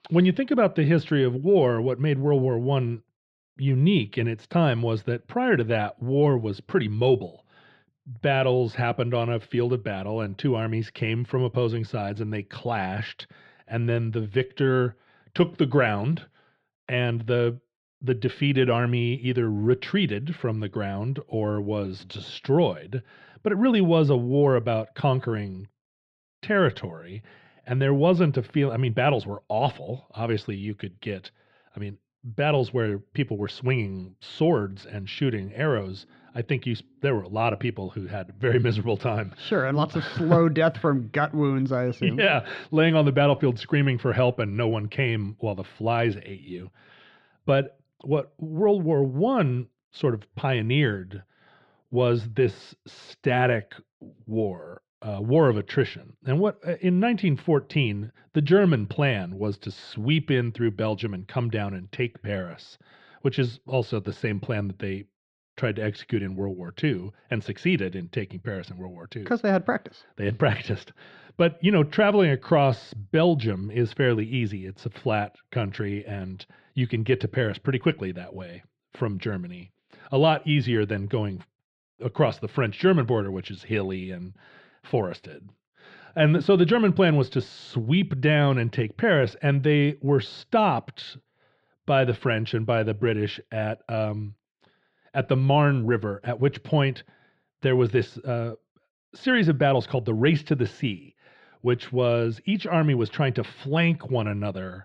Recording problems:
muffled; slightly; fading above 4 kHz

